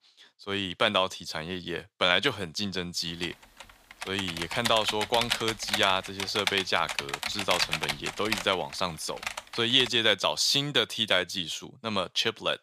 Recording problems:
thin; somewhat; fading below 1 kHz
keyboard typing; noticeable; from 3 to 10 s; peak level with the speech

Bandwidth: 15 kHz